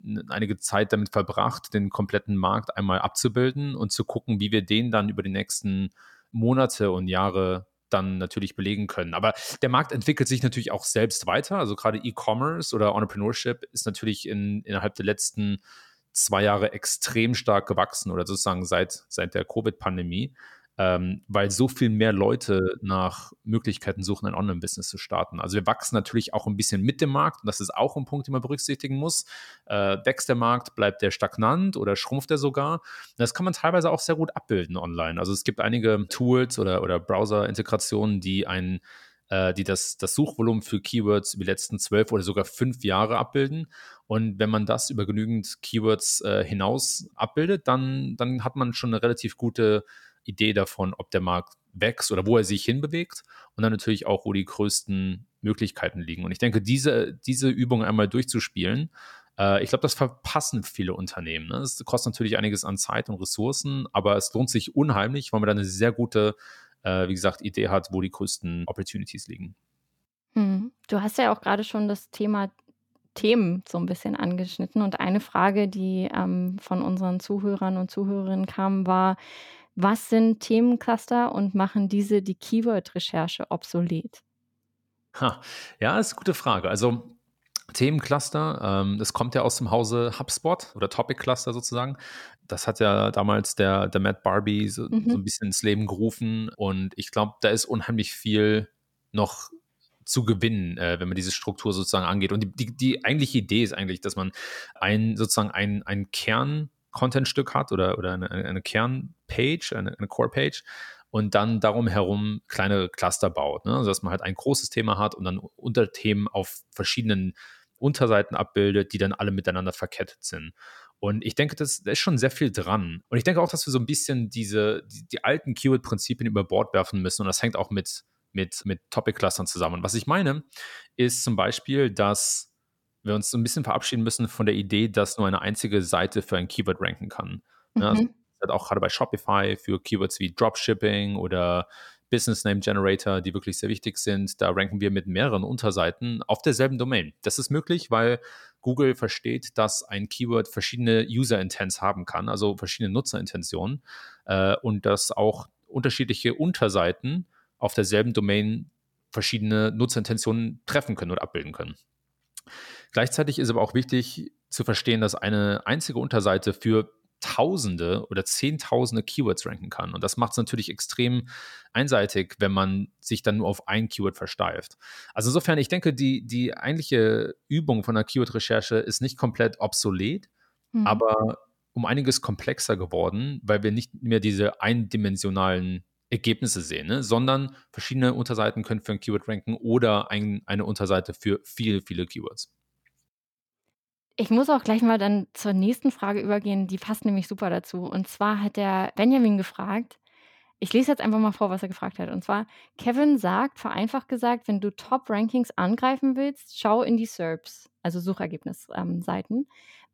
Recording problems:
none

